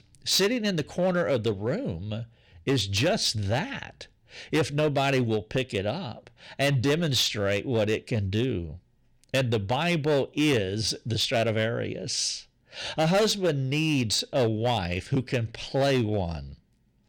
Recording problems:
distortion; slight; 6% of the sound clipped

